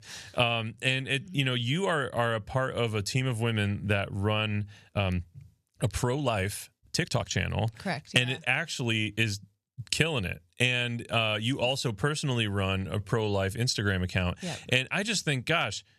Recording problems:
uneven, jittery; strongly; from 1 to 14 s

